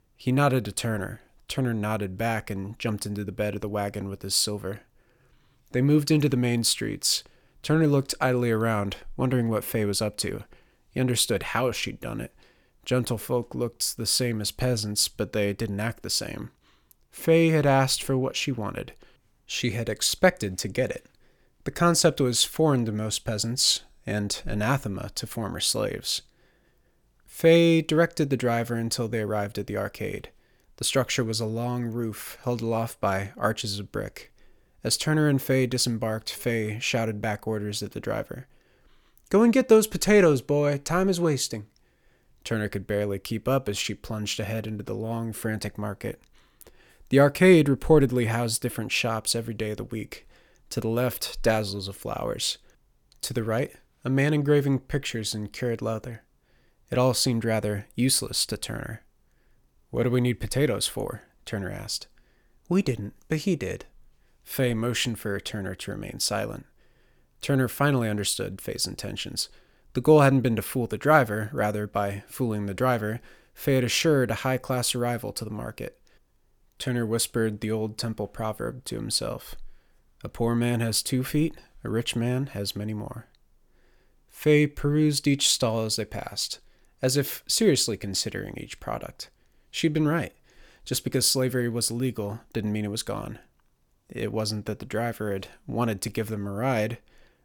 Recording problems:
none

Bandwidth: 18.5 kHz